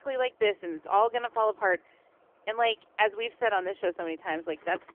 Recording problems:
phone-call audio; poor line; nothing above 3 kHz
traffic noise; faint; throughout; 30 dB below the speech

